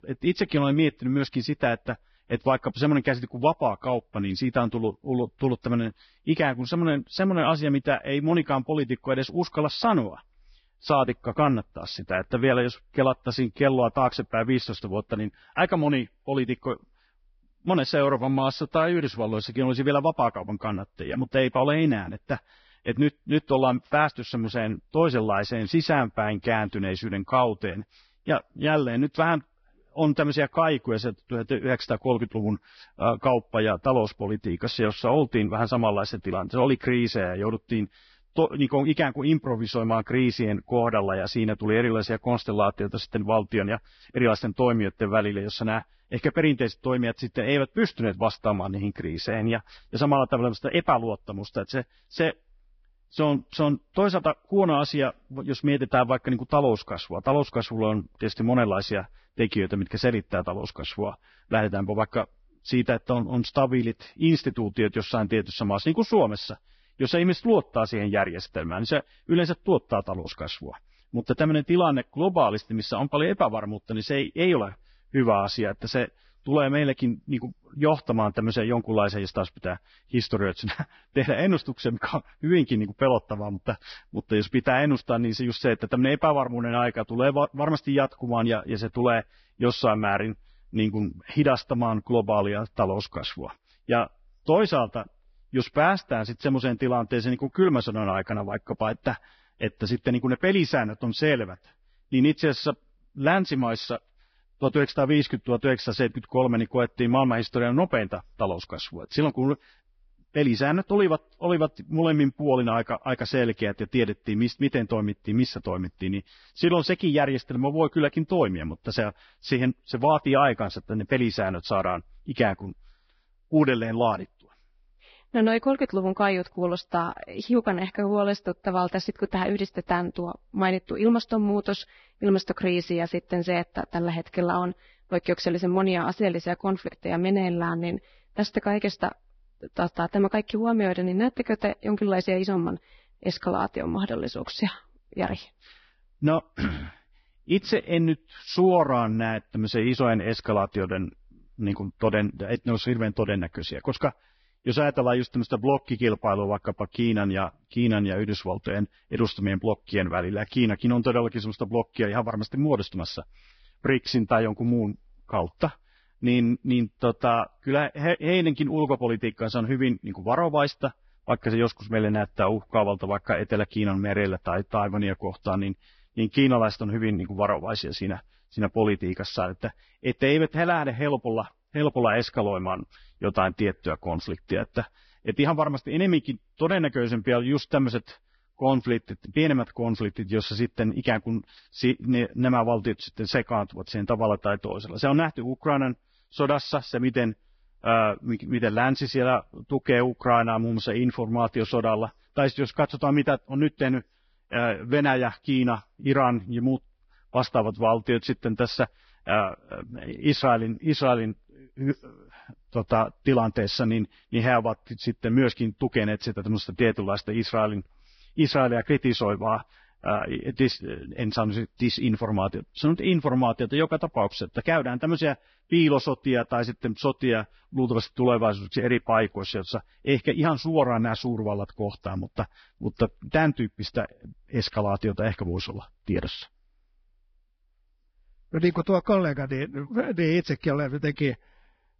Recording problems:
garbled, watery; badly; nothing above 5.5 kHz

